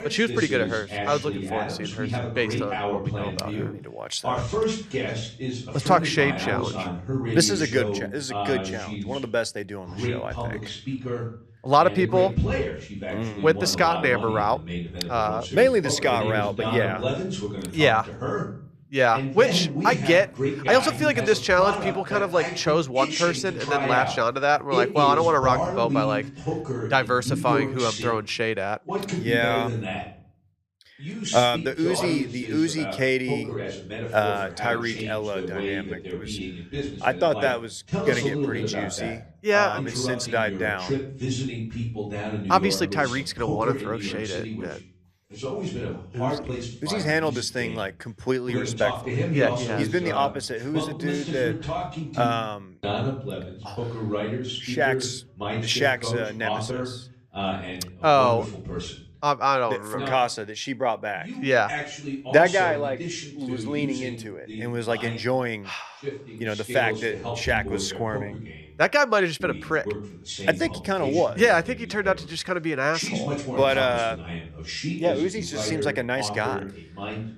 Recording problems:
voice in the background; loud; throughout; 6 dB below the speech

